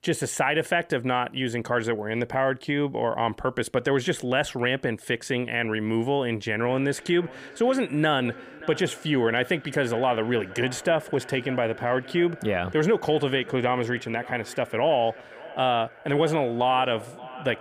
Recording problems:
echo of what is said; noticeable; from 6.5 s on; 580 ms later, 15 dB below the speech

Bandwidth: 15 kHz